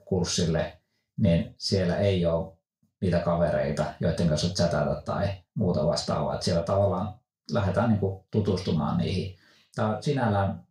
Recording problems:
off-mic speech; far
room echo; slight; dies away in 0.3 s

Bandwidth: 15.5 kHz